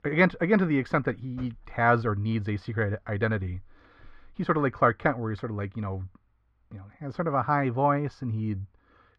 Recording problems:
muffled; very; fading above 2 kHz

